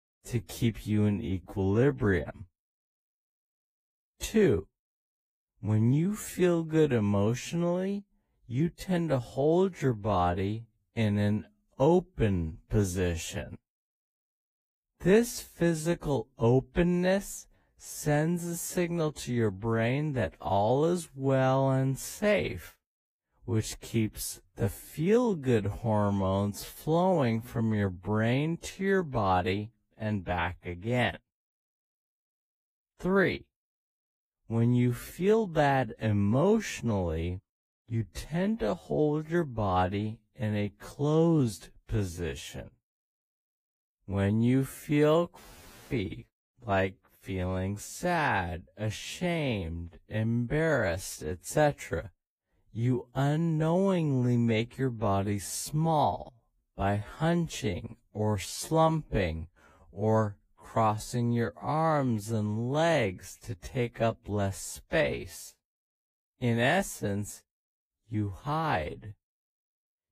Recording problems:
wrong speed, natural pitch; too slow; 0.5 times normal speed
garbled, watery; slightly; nothing above 15 kHz

